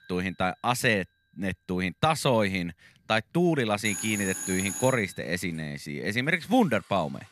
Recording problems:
alarms or sirens; loud; throughout; 6 dB below the speech

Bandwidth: 13.5 kHz